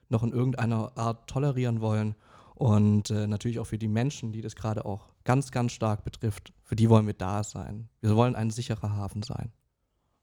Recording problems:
none

